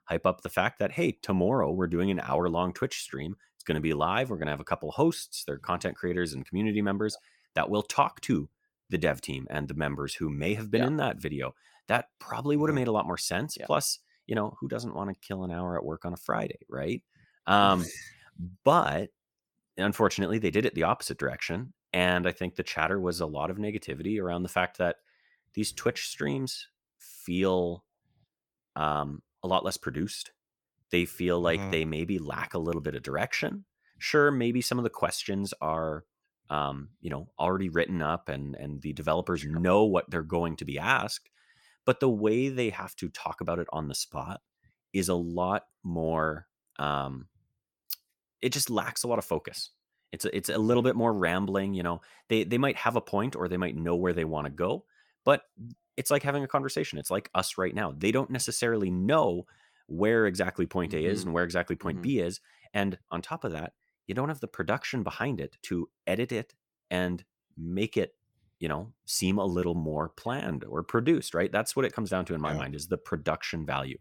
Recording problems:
none

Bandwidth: 18 kHz